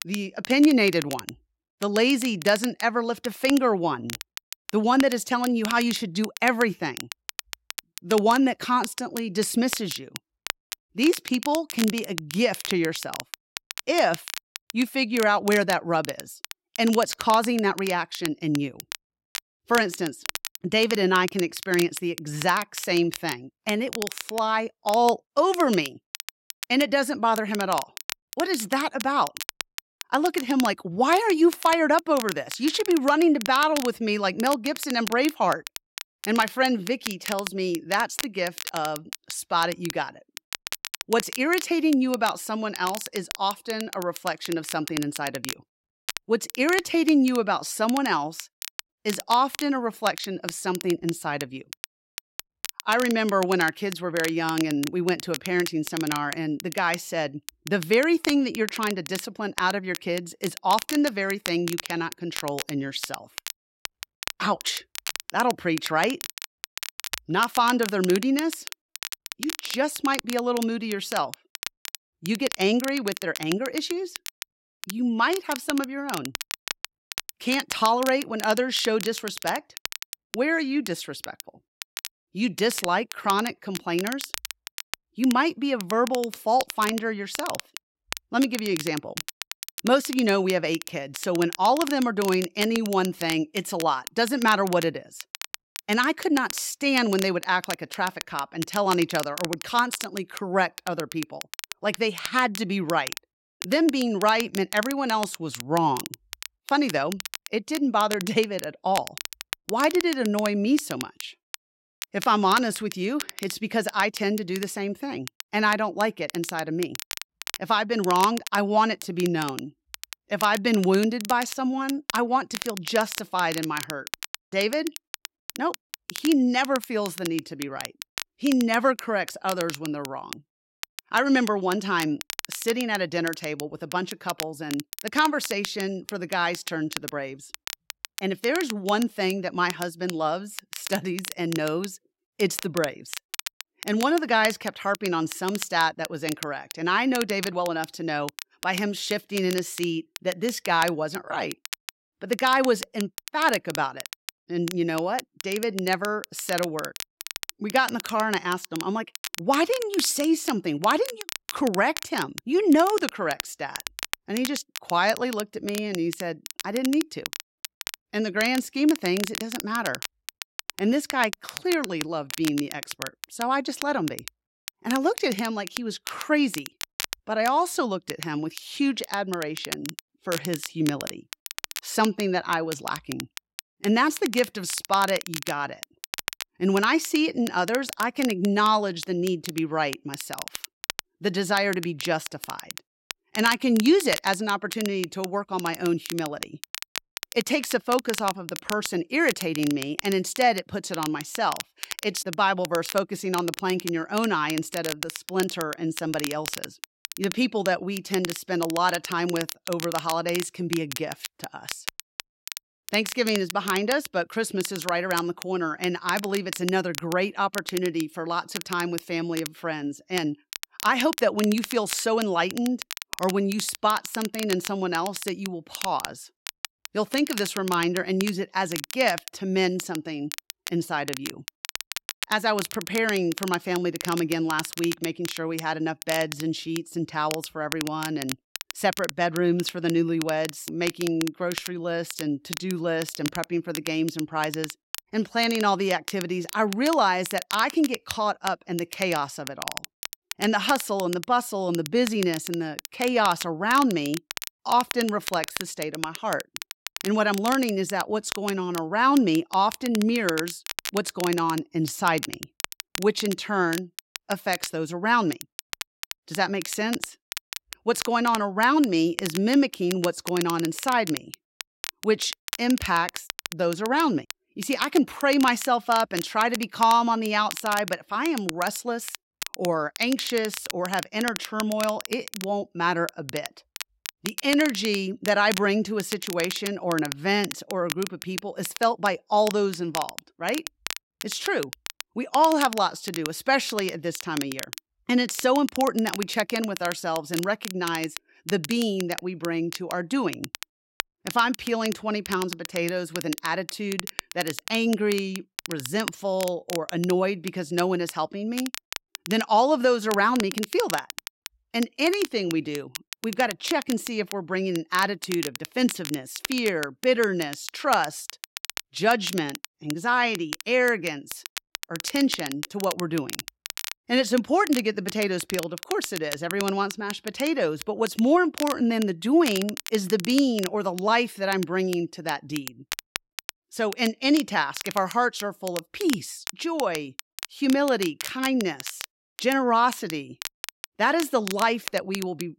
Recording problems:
crackle, like an old record; noticeable; 10 dB below the speech

